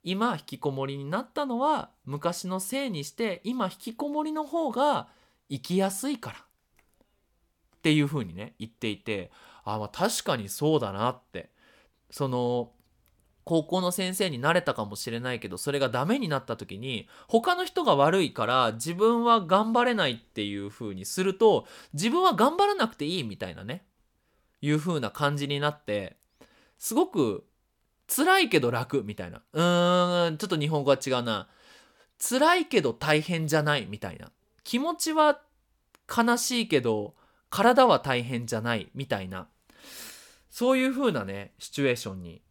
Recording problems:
none

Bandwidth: 18 kHz